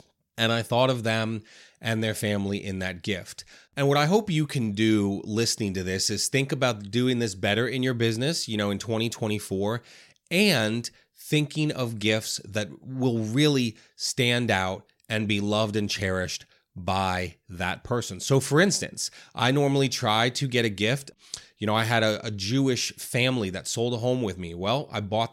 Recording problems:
none

